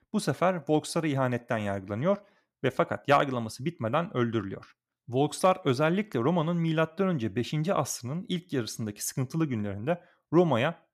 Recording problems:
none

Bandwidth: 14.5 kHz